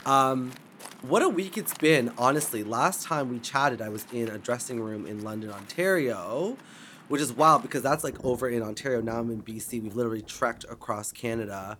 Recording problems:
rain or running water; faint; throughout; 20 dB below the speech

